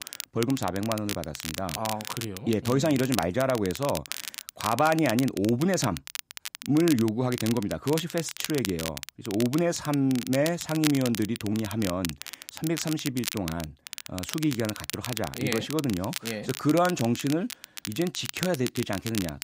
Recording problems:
crackle, like an old record; loud; 8 dB below the speech

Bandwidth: 15.5 kHz